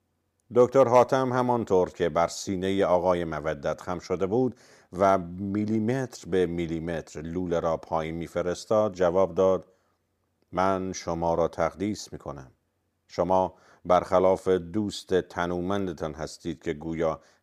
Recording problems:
none

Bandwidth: 15 kHz